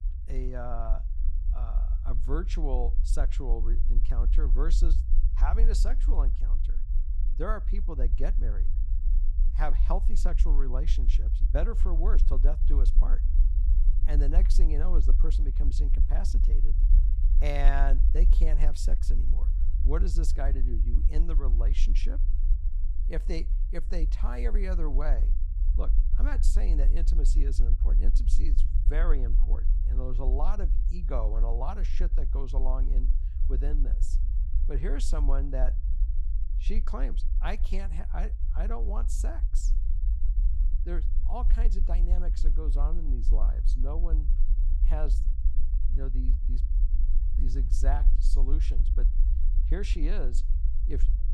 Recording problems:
low rumble; noticeable; throughout; 10 dB below the speech

